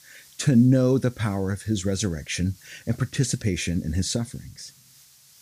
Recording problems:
hiss; faint; throughout; 25 dB below the speech

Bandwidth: 15 kHz